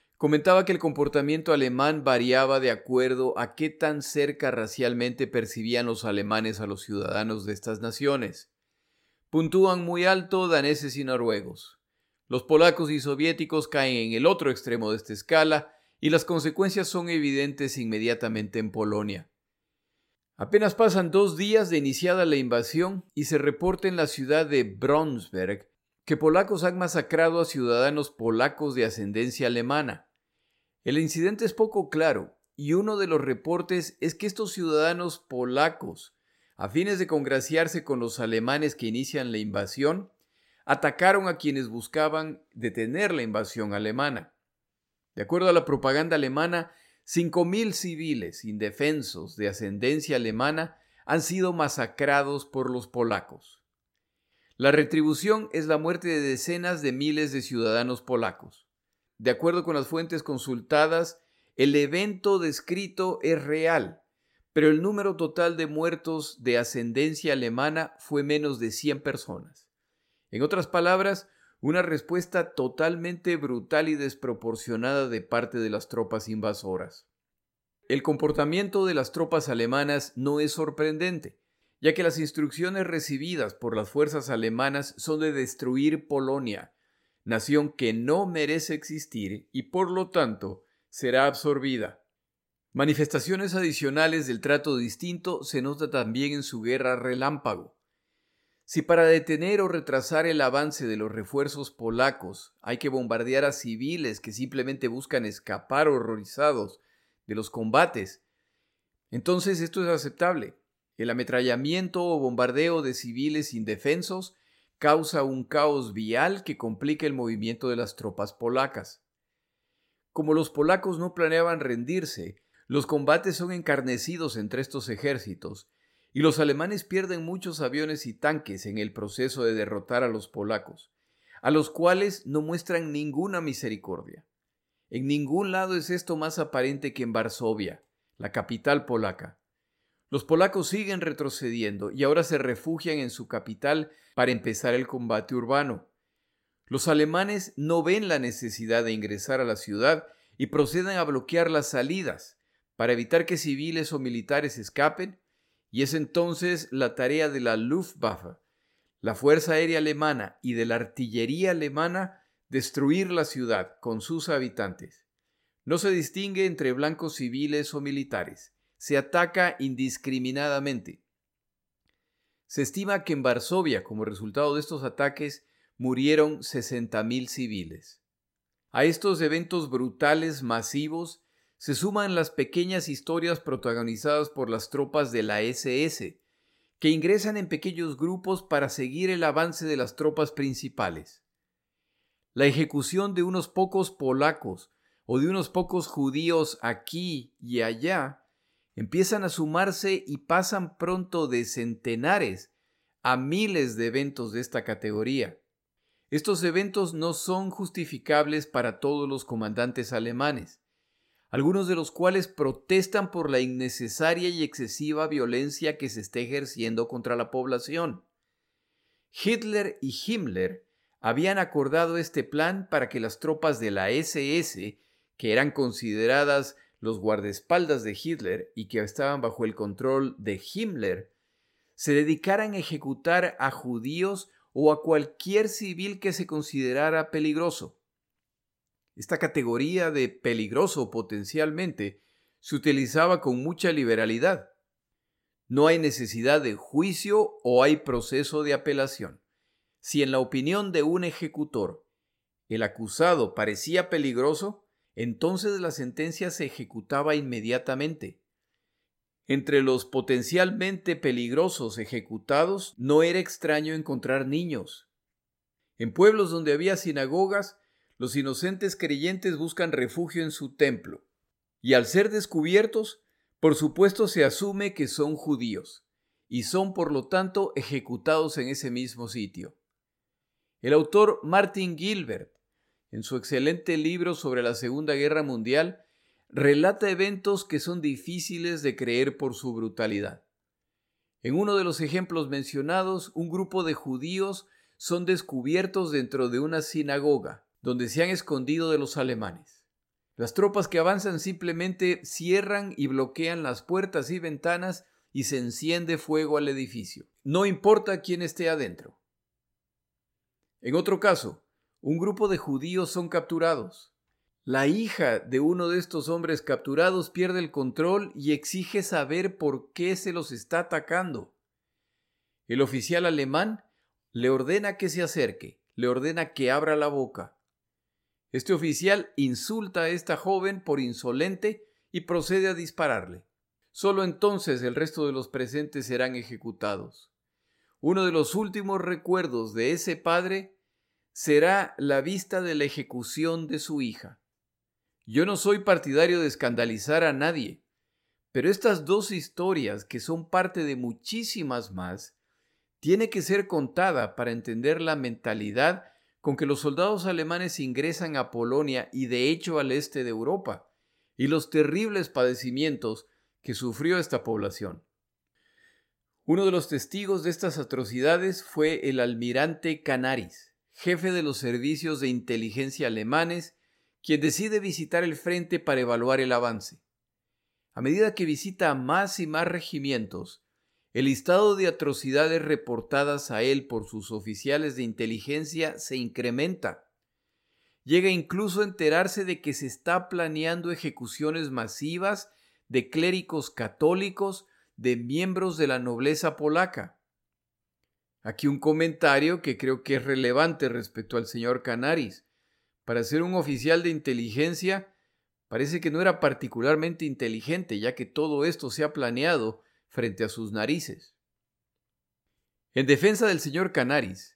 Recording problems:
none

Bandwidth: 16 kHz